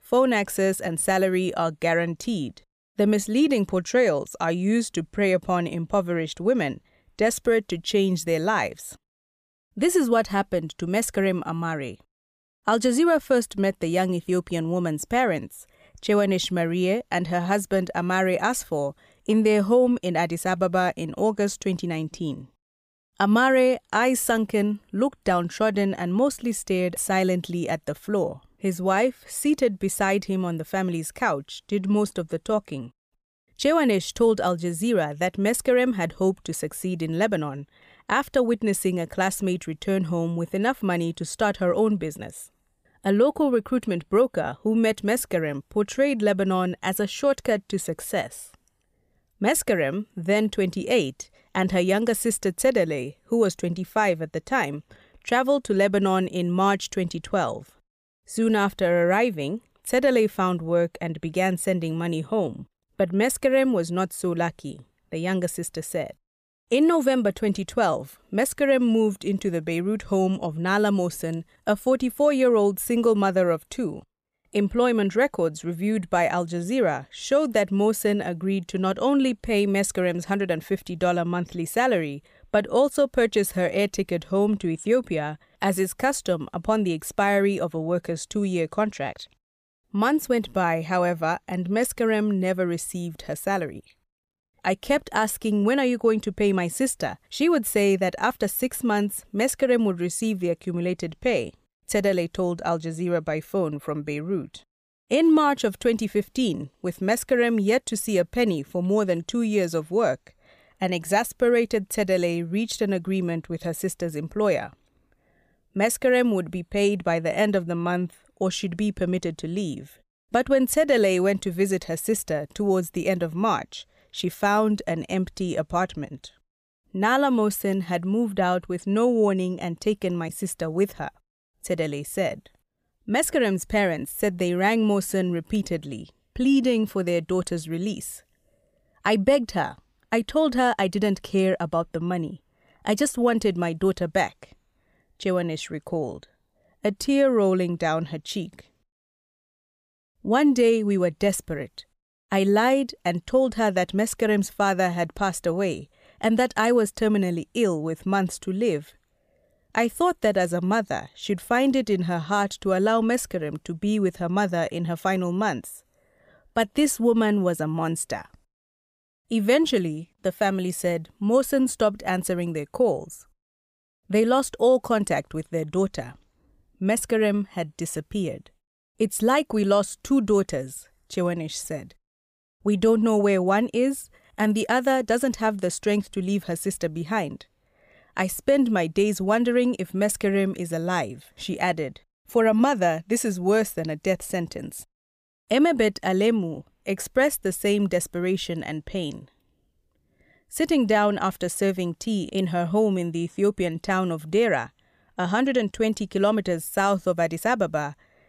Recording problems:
none

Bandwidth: 15 kHz